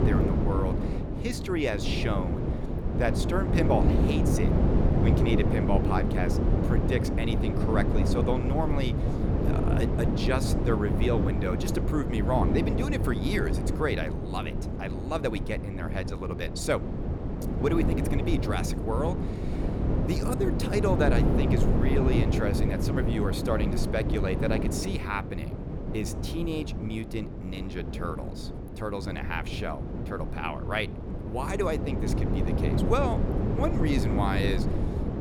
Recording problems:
wind noise on the microphone; heavy; 2 dB below the speech

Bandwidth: 19 kHz